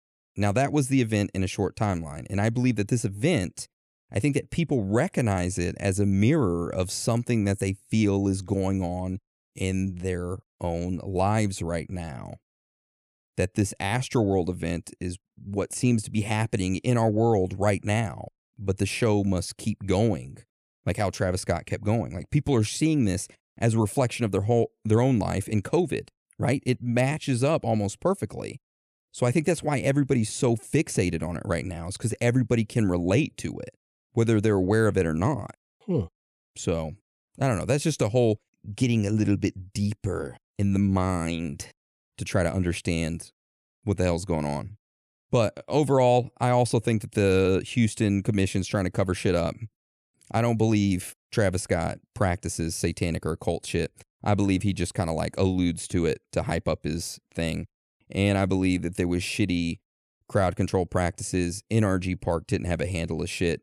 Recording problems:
none

